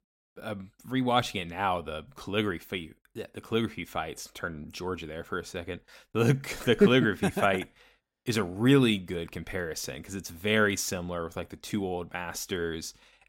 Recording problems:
none

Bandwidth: 16 kHz